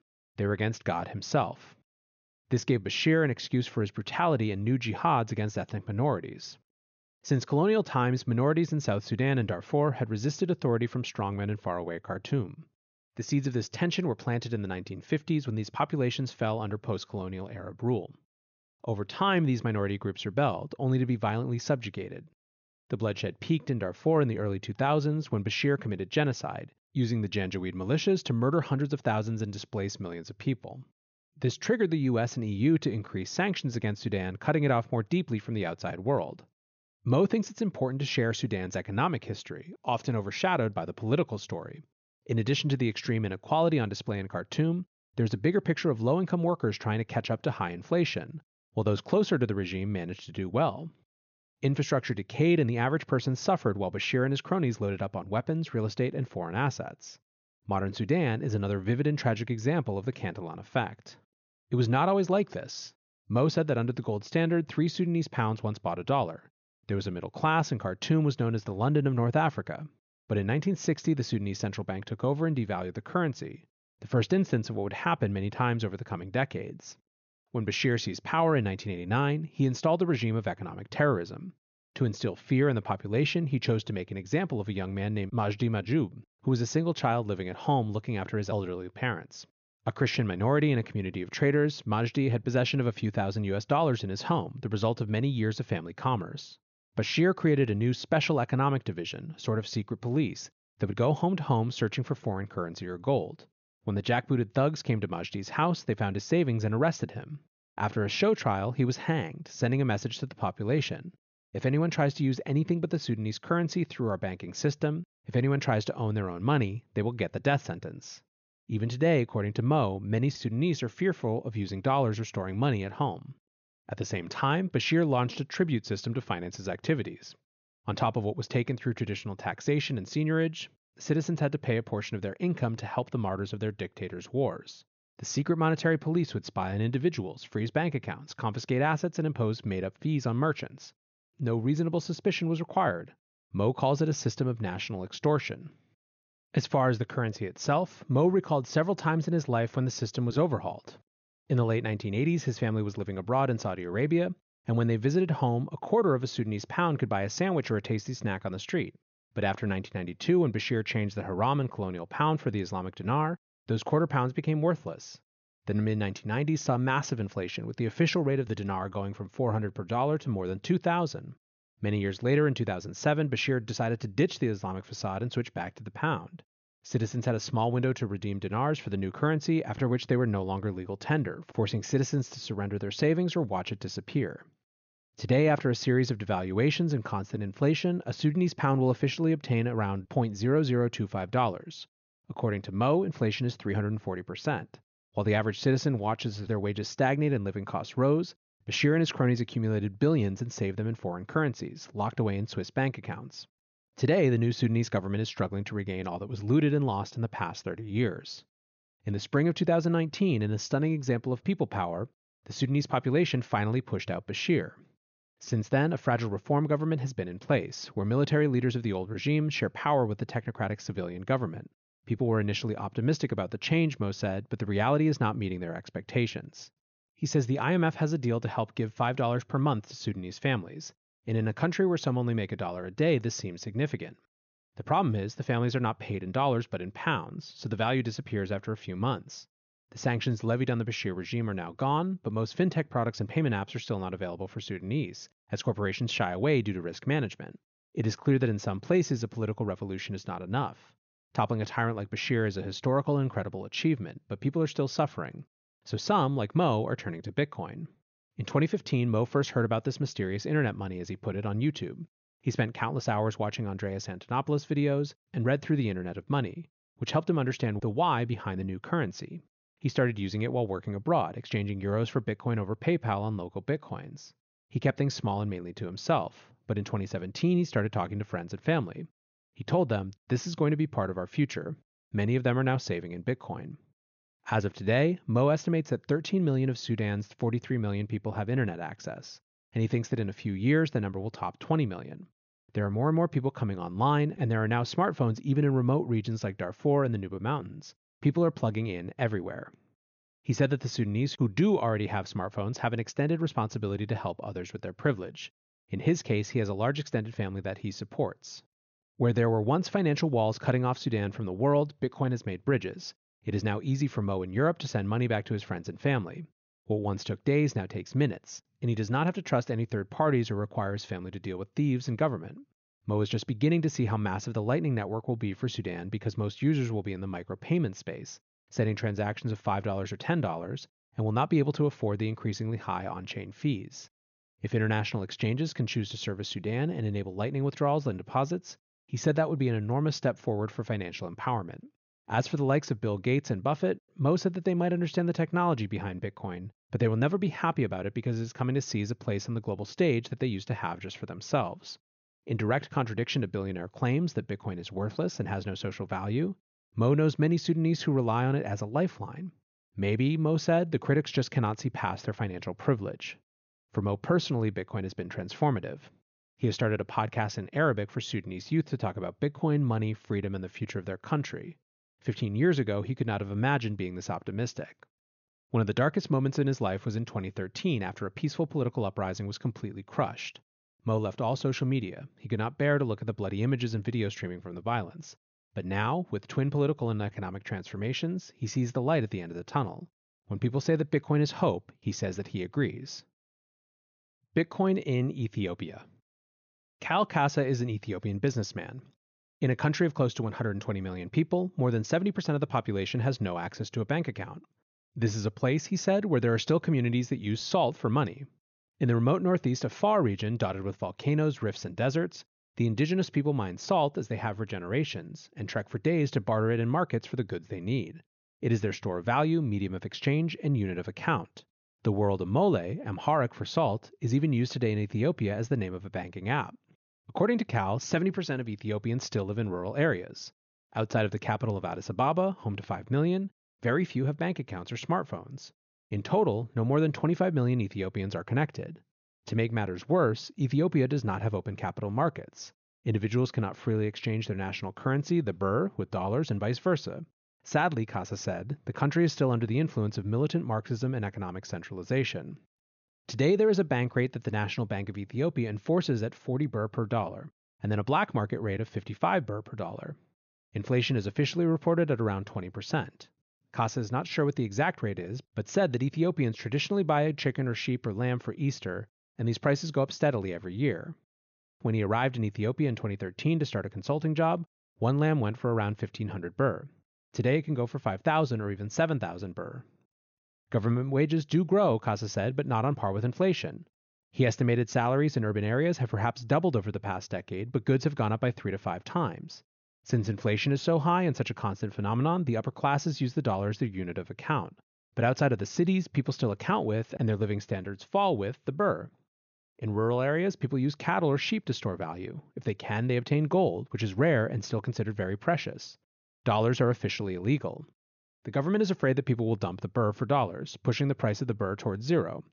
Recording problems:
high frequencies cut off; noticeable; nothing above 6.5 kHz

